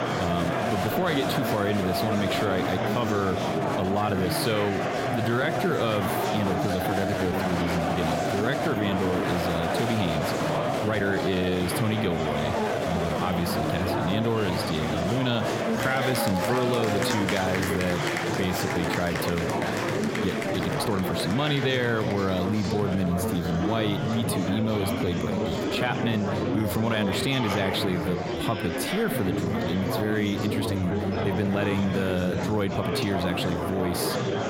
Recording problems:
squashed, flat; somewhat
murmuring crowd; loud; throughout; as loud as the speech
uneven, jittery; strongly; from 3.5 to 33 s

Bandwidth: 16.5 kHz